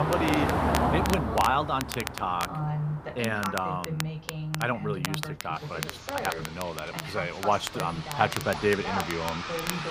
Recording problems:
traffic noise; loud; throughout; 3 dB below the speech
voice in the background; loud; throughout; 6 dB below the speech
crackle, like an old record; loud; 8 dB below the speech
abrupt cut into speech; at the start

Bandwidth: 15 kHz